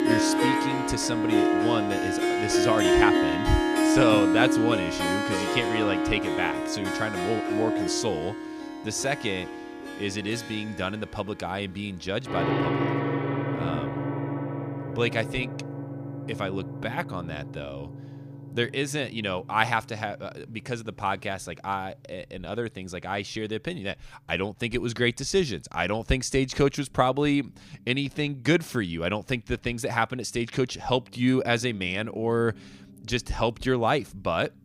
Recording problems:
background music; very loud; throughout; 1 dB above the speech

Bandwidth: 15 kHz